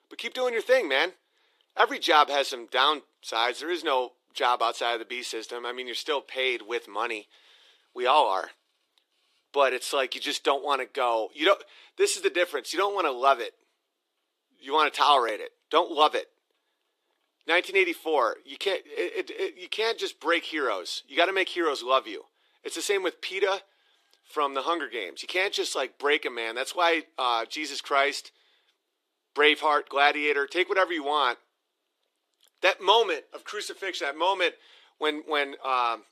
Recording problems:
thin; somewhat; fading below 350 Hz

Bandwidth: 14 kHz